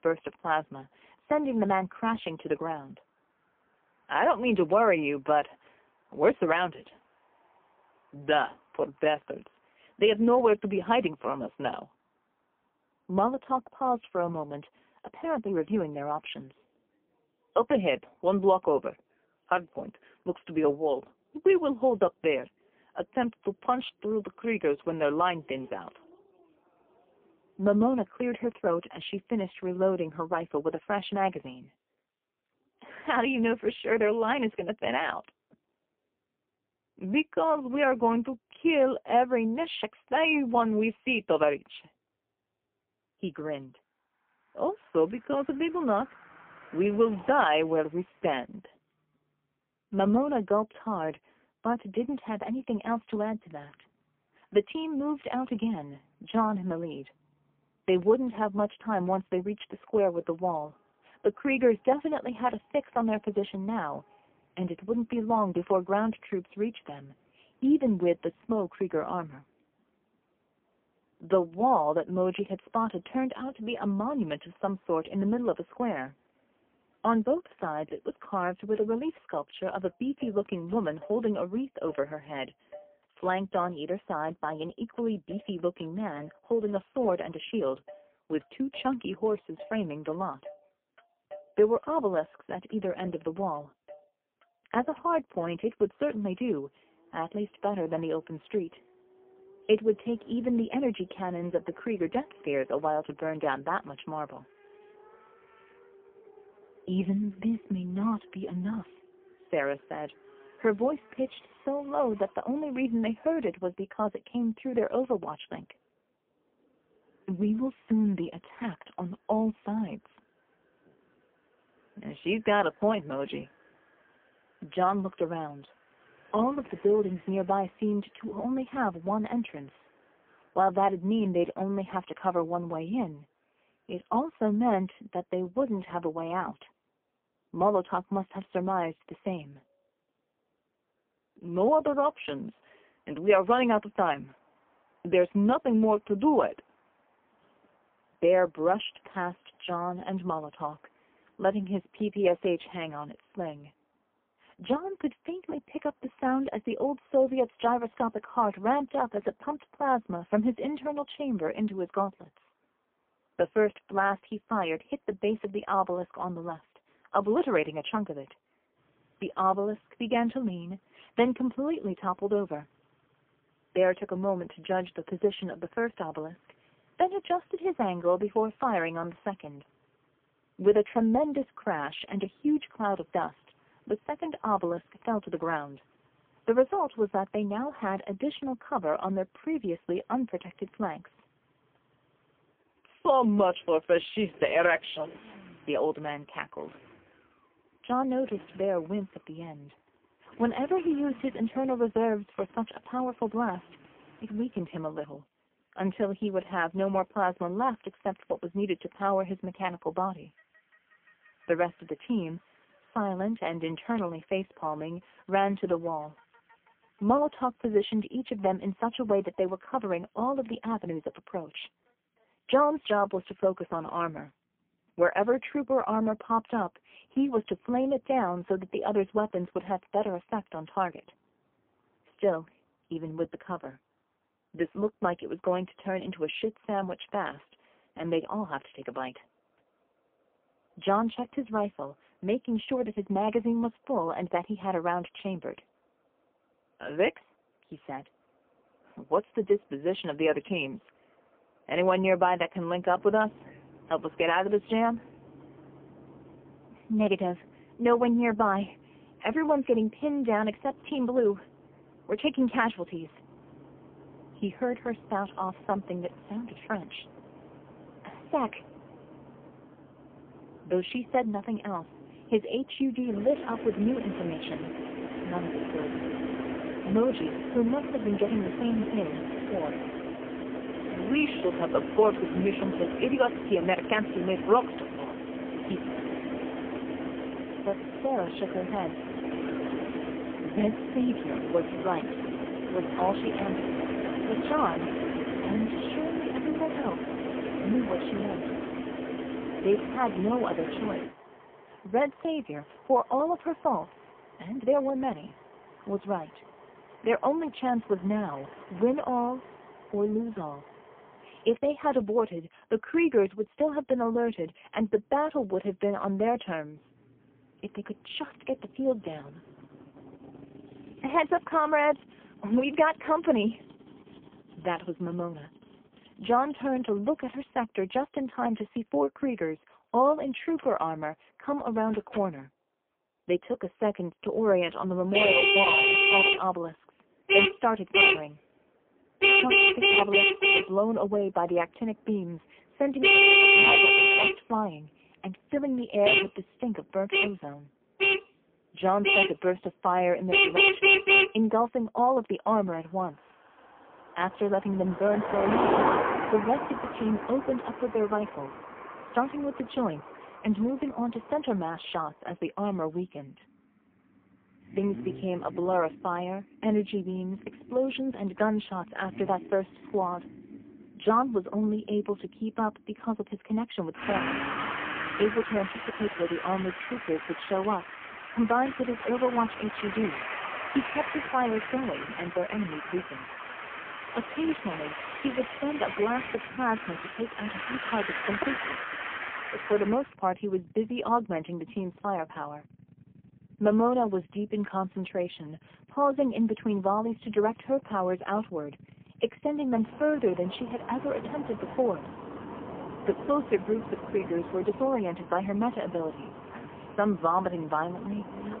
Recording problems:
phone-call audio; poor line; nothing above 3.5 kHz
traffic noise; very loud; throughout; 3 dB above the speech

